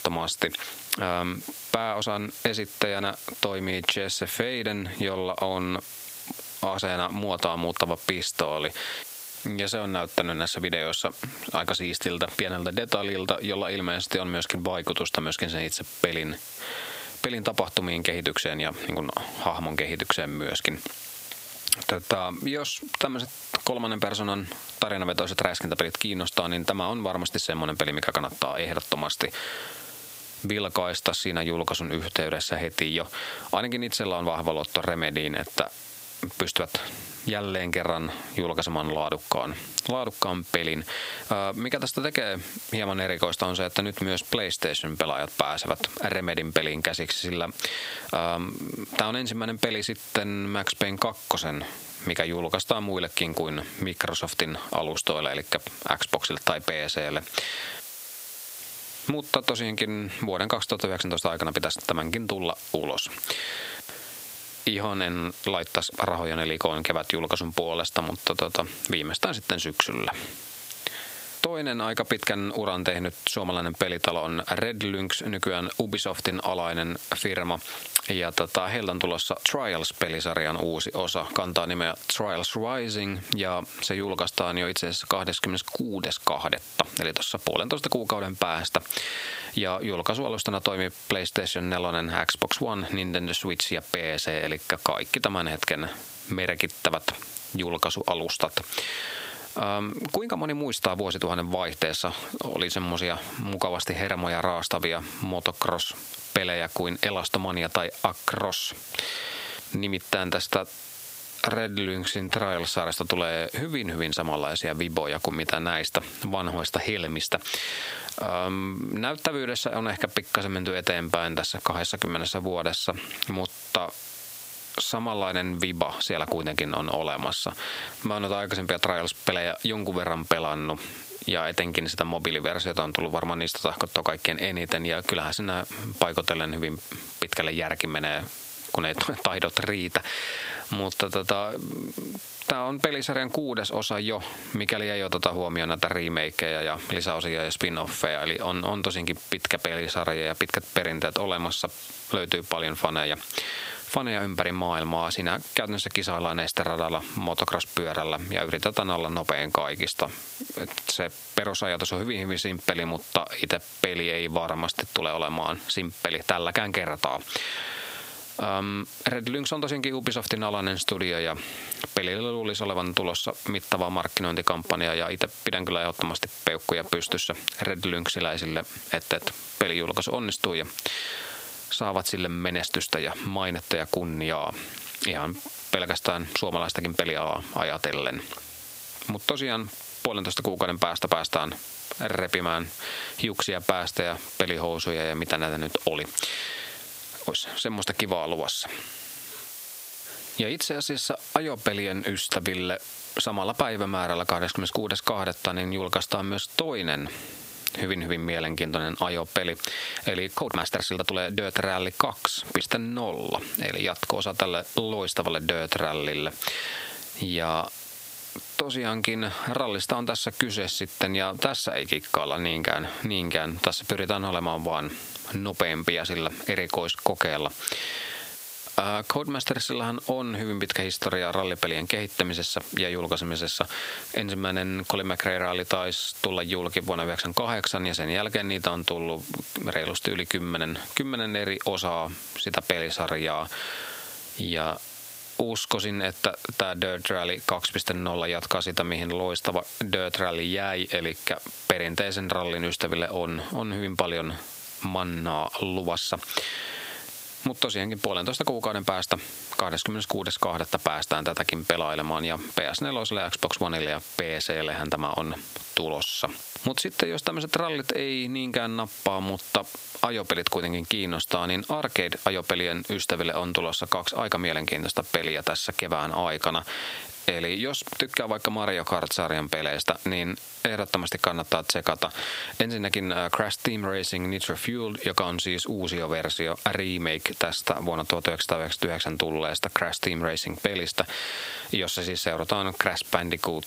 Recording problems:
thin; very slightly; fading below 850 Hz
squashed, flat; somewhat
hiss; noticeable; throughout; 15 dB below the speech
uneven, jittery; strongly; from 22 s to 3:32

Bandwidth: 15.5 kHz